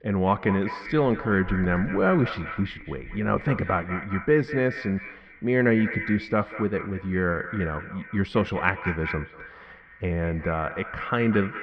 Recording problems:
echo of what is said; strong; throughout; 190 ms later, 10 dB below the speech
muffled; very; fading above 2.5 kHz

